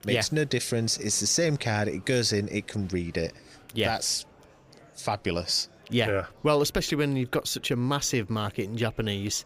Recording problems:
murmuring crowd; faint; throughout; 25 dB below the speech

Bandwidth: 15 kHz